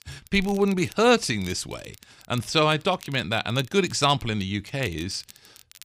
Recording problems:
crackle, like an old record; faint; 25 dB below the speech

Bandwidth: 15 kHz